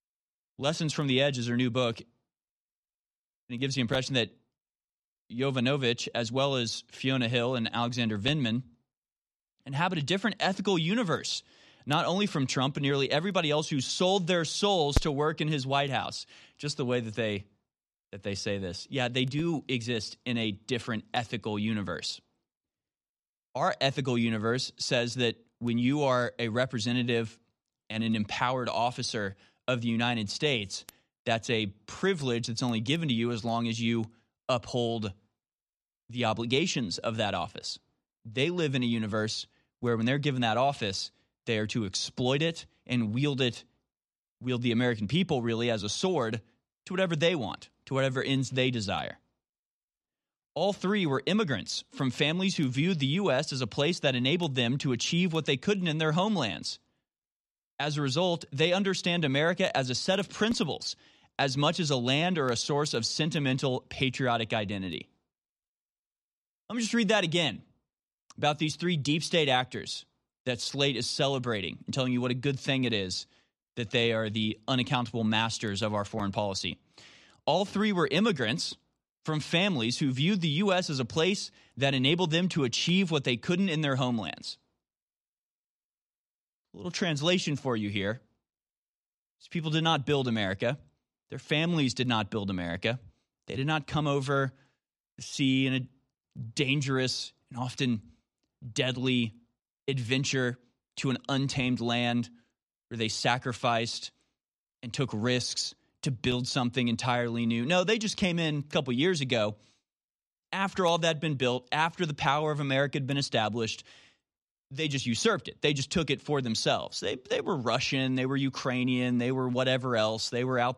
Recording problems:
none

